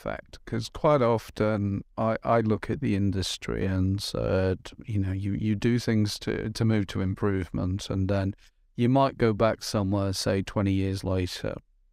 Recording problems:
none

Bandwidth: 15.5 kHz